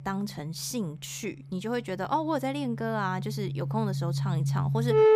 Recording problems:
background music; very loud; throughout; 2 dB above the speech

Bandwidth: 15 kHz